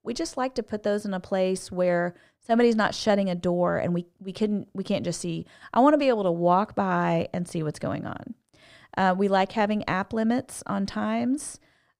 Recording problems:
muffled; slightly; fading above 2 kHz

